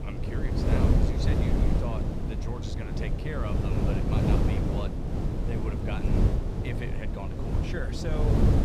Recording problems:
wind noise on the microphone; heavy; 4 dB above the speech

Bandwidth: 15 kHz